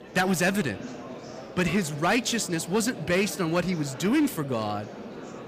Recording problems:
distortion; slight; 5% of the sound clipped
murmuring crowd; noticeable; throughout; 15 dB below the speech

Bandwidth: 15 kHz